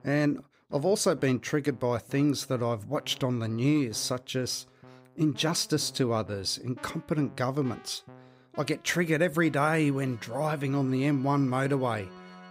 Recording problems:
background music; faint; throughout; 25 dB below the speech

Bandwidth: 15.5 kHz